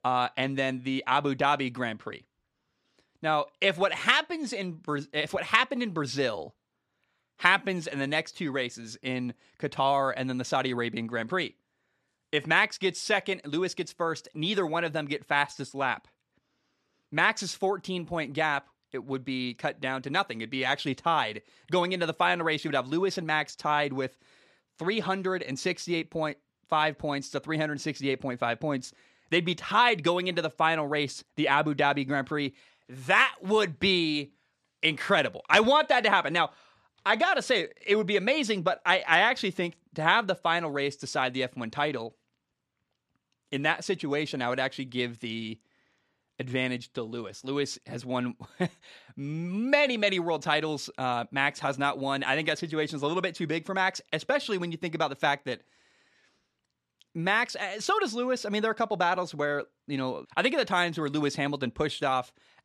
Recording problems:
none

